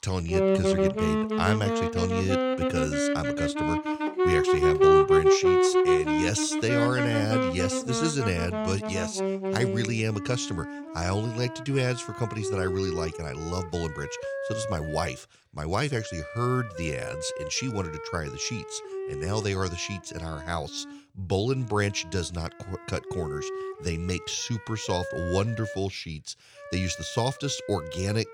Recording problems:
background music; very loud; throughout; 3 dB above the speech

